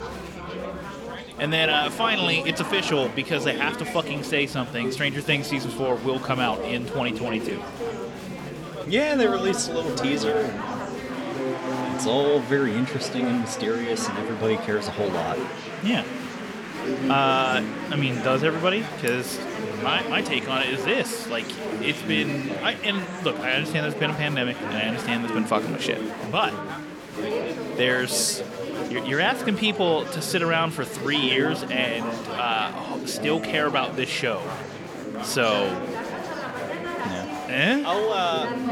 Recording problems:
chatter from many people; loud; throughout; 6 dB below the speech

